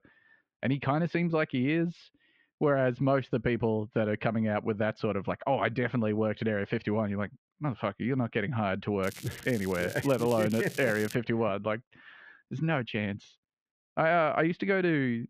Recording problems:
muffled; very; fading above 3 kHz
crackling; noticeable; from 9 to 11 s; 15 dB below the speech

